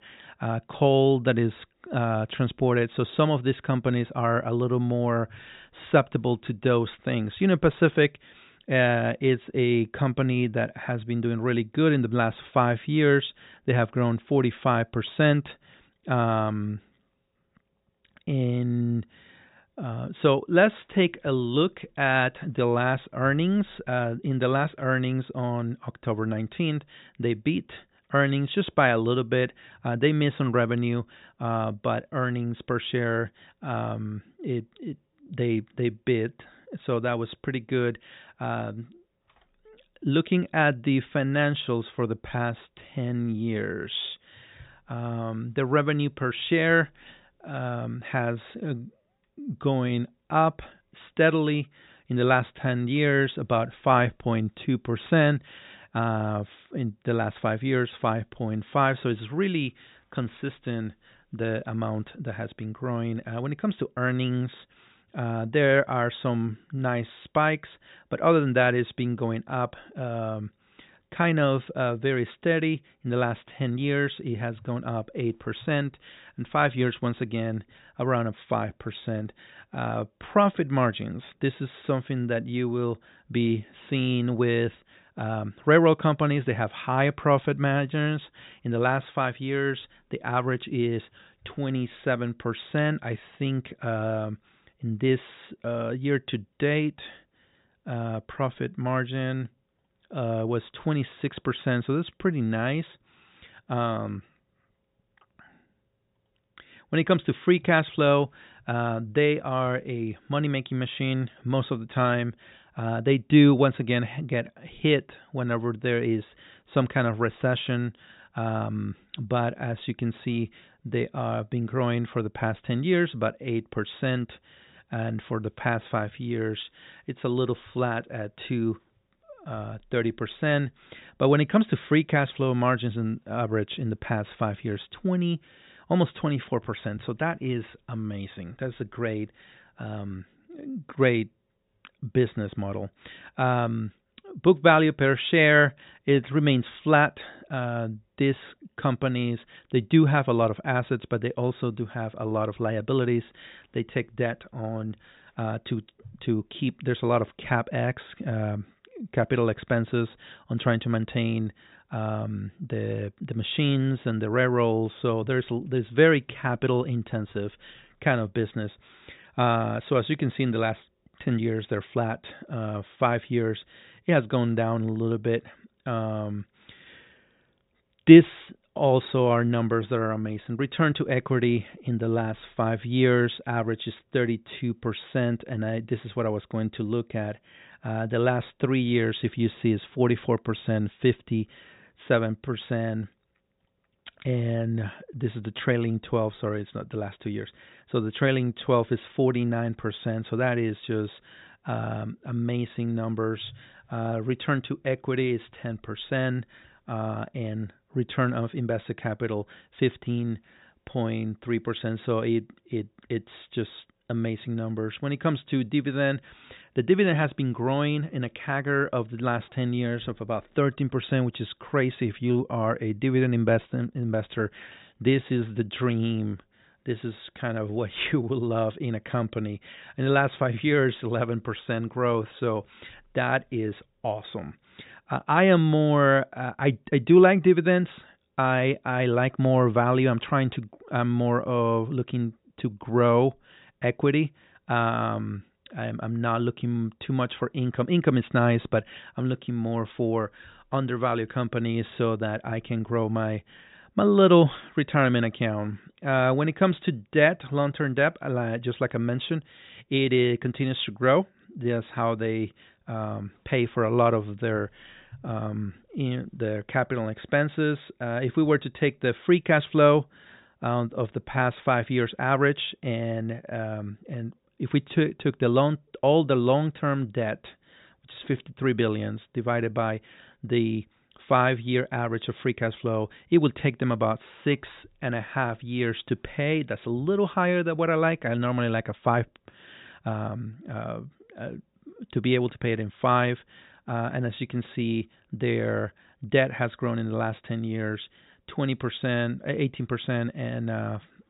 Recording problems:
high frequencies cut off; severe; nothing above 4 kHz

